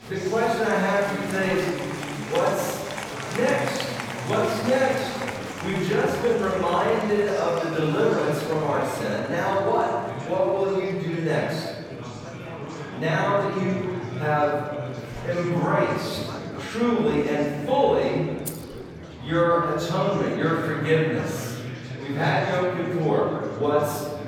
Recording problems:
room echo; strong; dies away in 1.5 s
off-mic speech; far
murmuring crowd; noticeable; throughout; 10 dB below the speech
jangling keys; faint; at 18 s; peak 10 dB below the speech

